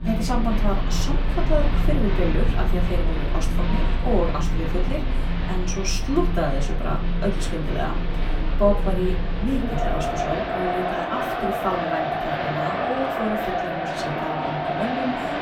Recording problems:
off-mic speech; far
room echo; very slight; dies away in 0.3 s
crowd noise; very loud; throughout; 2 dB above the speech

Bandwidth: 17 kHz